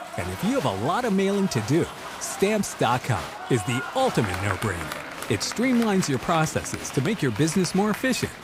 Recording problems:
crowd noise; loud; throughout; 10 dB below the speech
household noises; faint; throughout; 20 dB below the speech

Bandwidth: 15.5 kHz